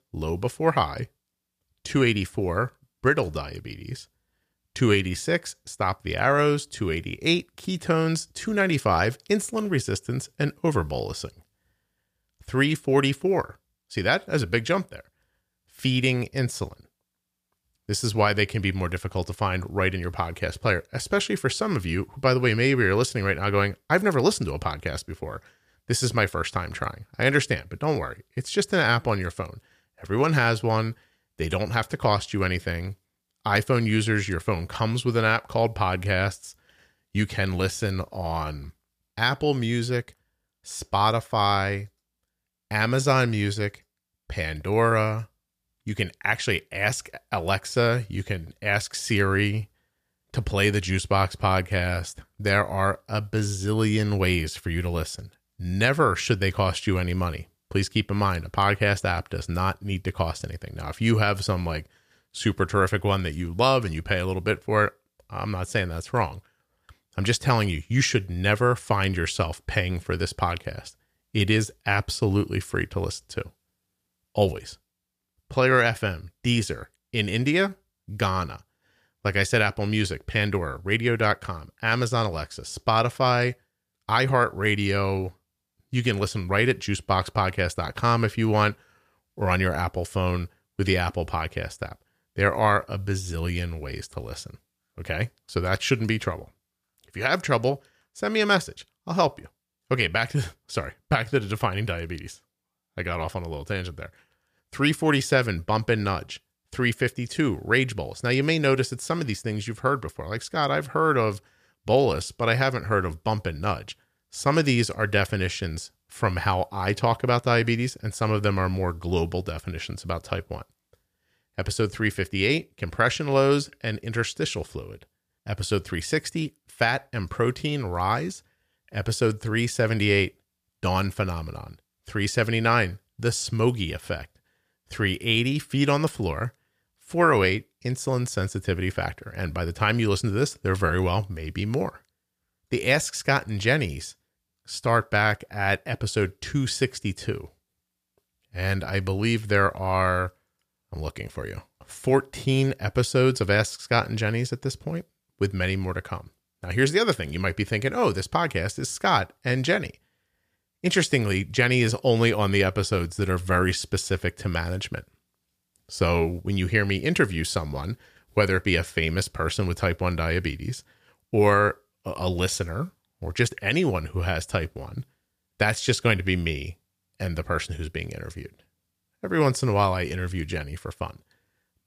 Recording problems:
none

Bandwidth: 15 kHz